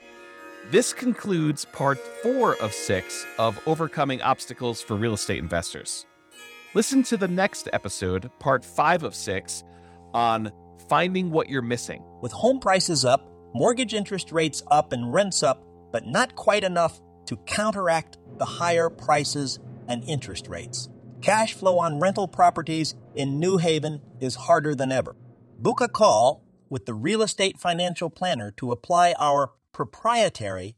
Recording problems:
background music; faint; throughout; 20 dB below the speech

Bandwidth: 17 kHz